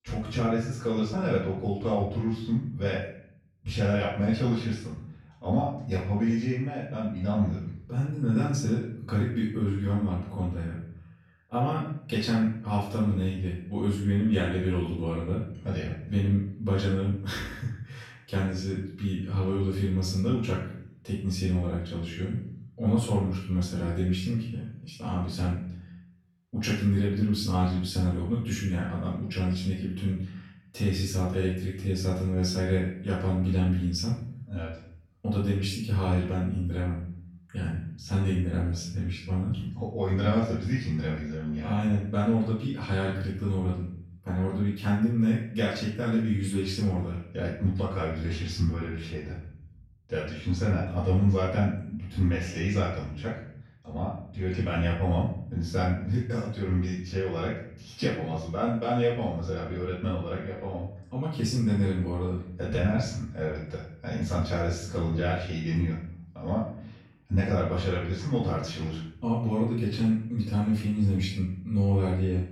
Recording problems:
off-mic speech; far
room echo; noticeable; dies away in 0.7 s

